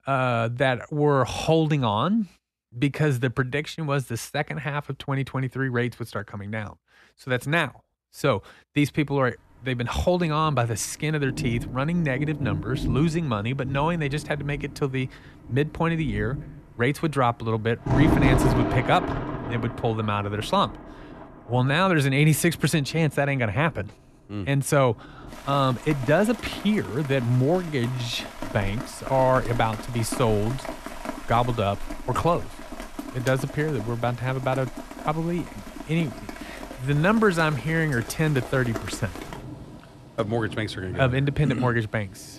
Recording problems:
rain or running water; loud; from 9.5 s on; 9 dB below the speech

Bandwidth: 13.5 kHz